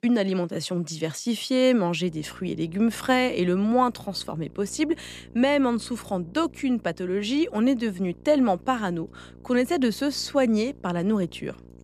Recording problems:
electrical hum; faint; from 2 s on; 60 Hz, 30 dB below the speech

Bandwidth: 14.5 kHz